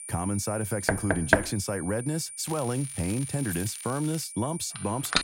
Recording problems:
high-pitched whine; loud; throughout; 9 kHz, 7 dB below the speech
crackling; noticeable; from 2.5 to 4 s; 15 dB below the speech
door banging; loud; at 1 s; peak 6 dB above the speech
jangling keys; faint; at 3.5 s; peak 10 dB below the speech
phone ringing; noticeable; at 5 s; peak 8 dB below the speech

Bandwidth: 16 kHz